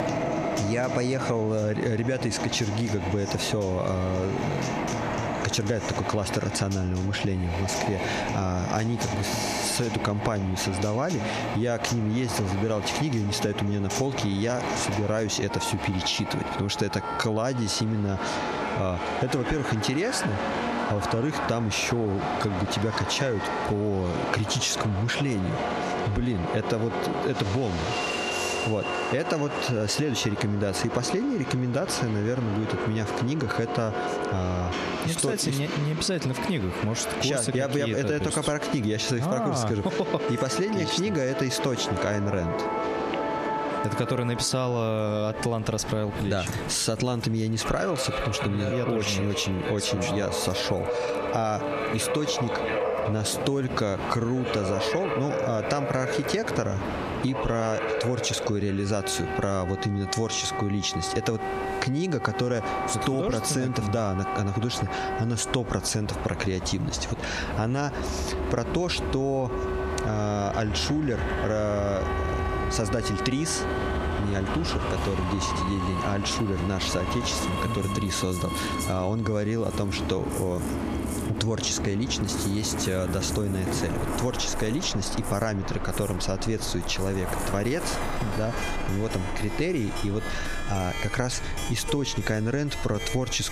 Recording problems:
squashed, flat; heavily, background pumping
background music; loud; throughout; 9 dB below the speech
train or aircraft noise; loud; throughout; 5 dB below the speech

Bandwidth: 14.5 kHz